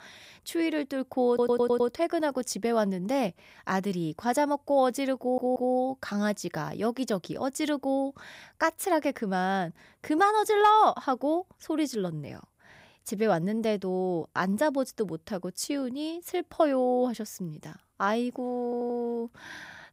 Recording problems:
audio stuttering; at 1.5 s, at 5 s and at 19 s

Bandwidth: 15.5 kHz